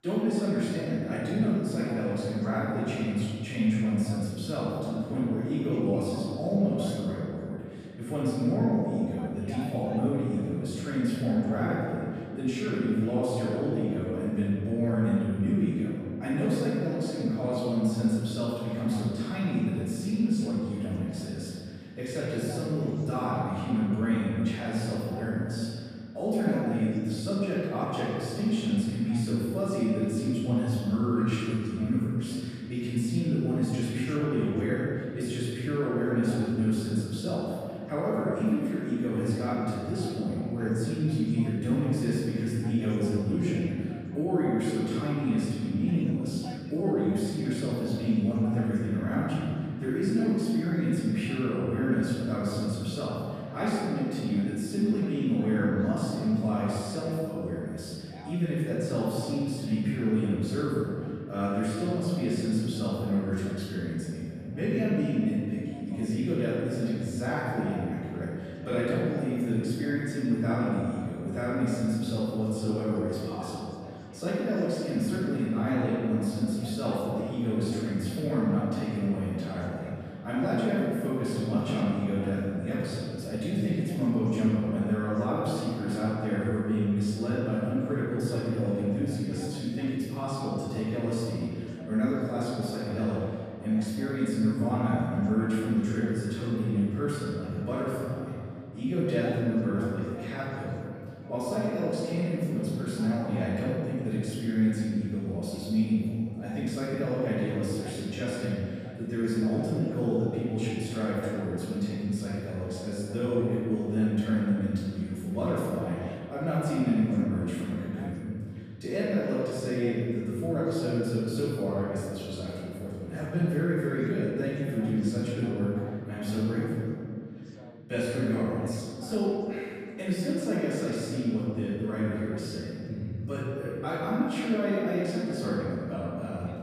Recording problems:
room echo; strong; dies away in 2.3 s
off-mic speech; far
voice in the background; faint; throughout; 25 dB below the speech

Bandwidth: 14.5 kHz